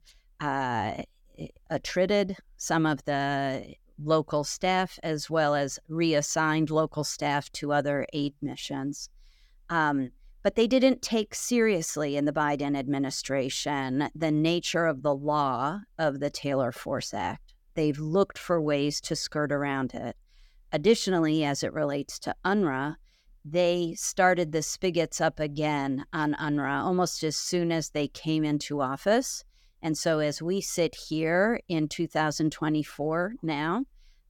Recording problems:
none

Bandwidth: 17.5 kHz